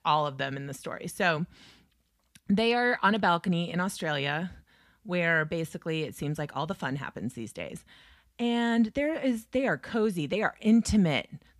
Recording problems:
none

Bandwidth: 15 kHz